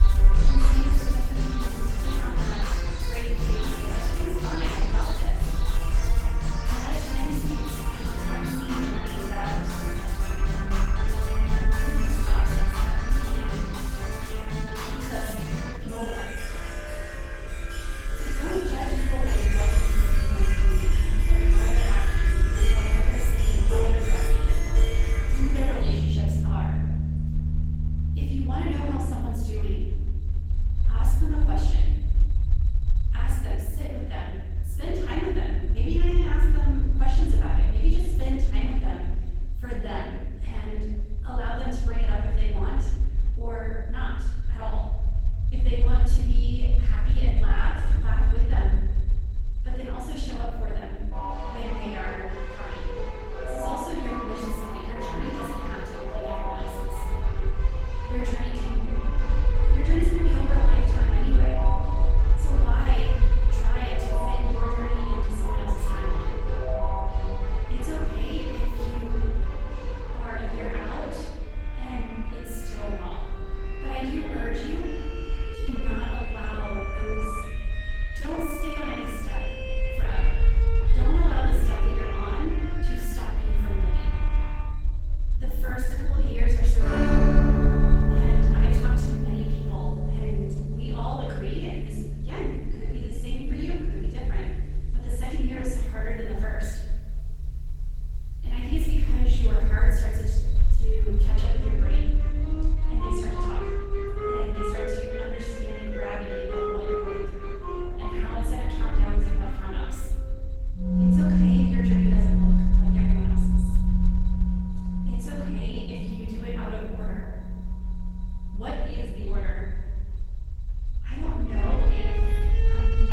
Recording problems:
room echo; strong; dies away in 1.4 s
off-mic speech; far
garbled, watery; slightly; nothing above 17 kHz
background music; very loud; throughout; 4 dB above the speech
low rumble; noticeable; throughout; 10 dB below the speech
uneven, jittery; strongly; from 16 s to 1:56

